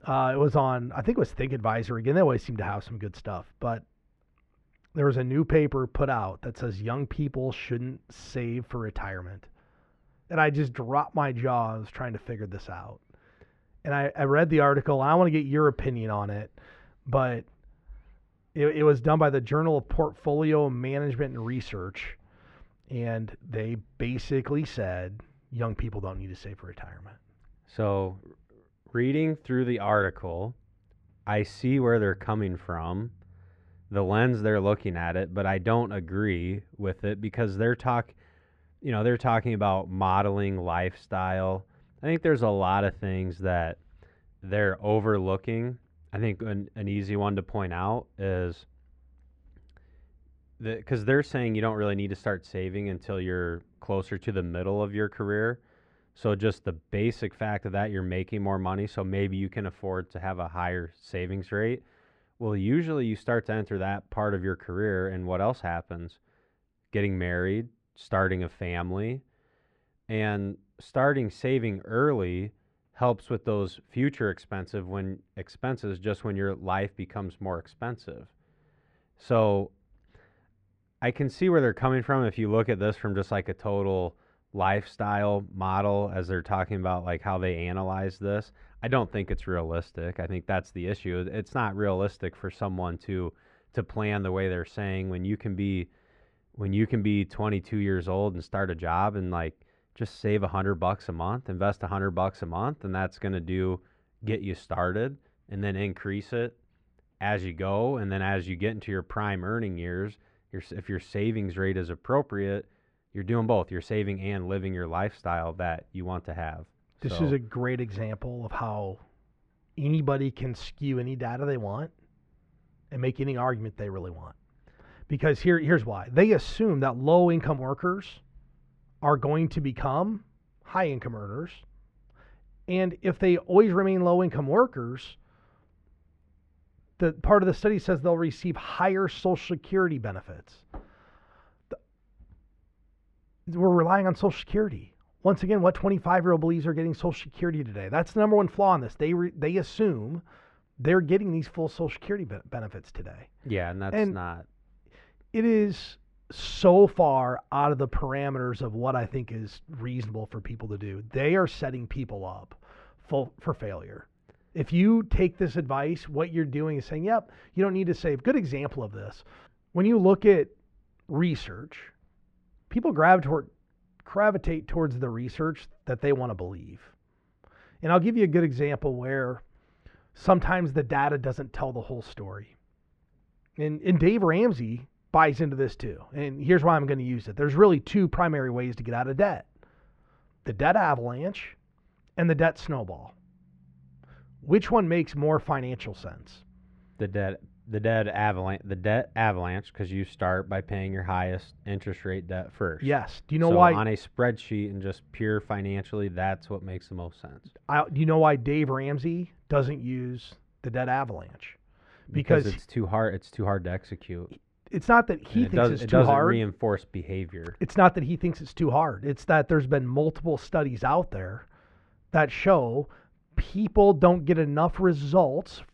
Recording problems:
muffled; very; fading above 2 kHz

